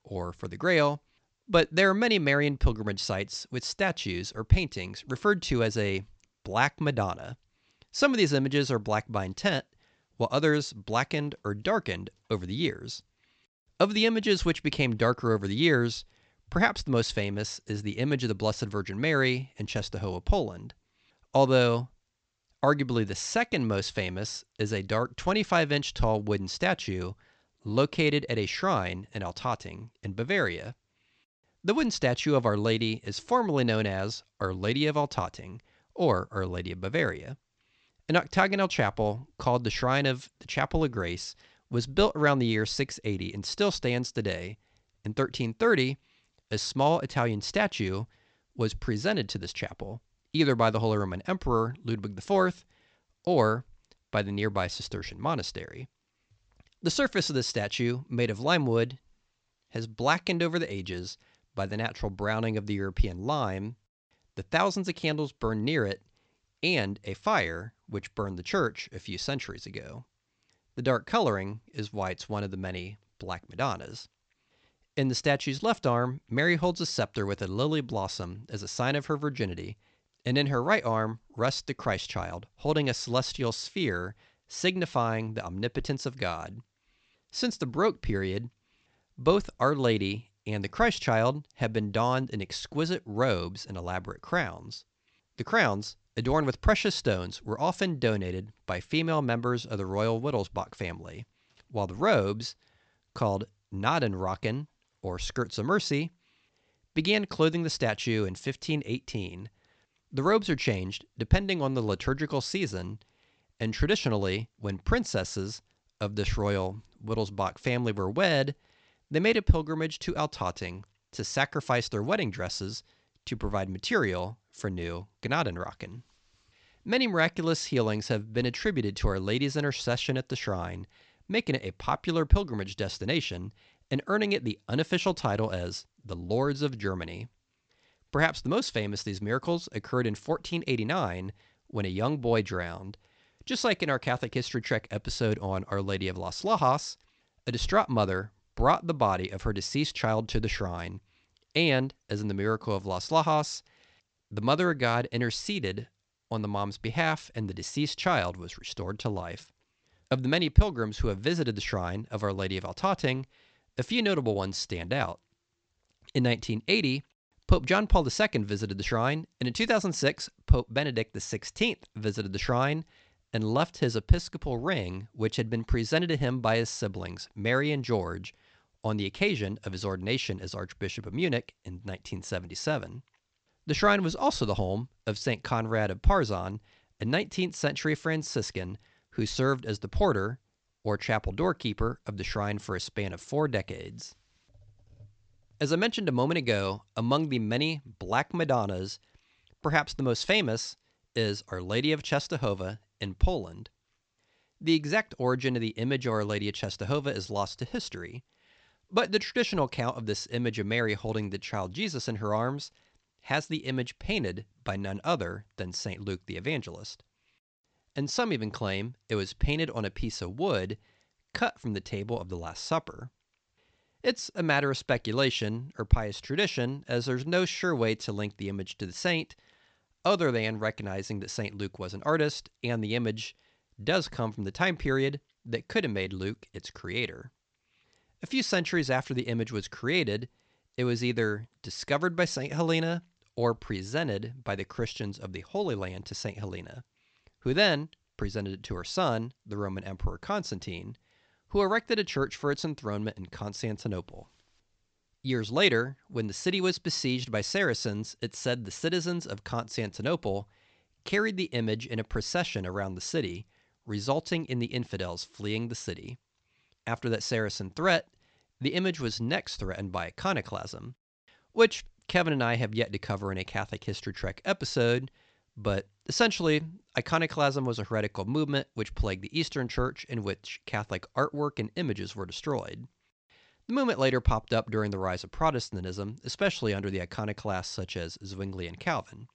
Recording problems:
high frequencies cut off; noticeable; nothing above 8 kHz

